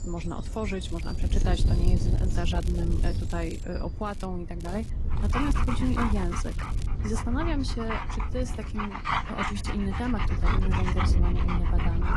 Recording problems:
garbled, watery; slightly; nothing above 11 kHz
wind noise on the microphone; heavy; 8 dB below the speech
animal sounds; loud; throughout; 3 dB below the speech
crackling; noticeable; 4 times, first at 1 s; 15 dB below the speech

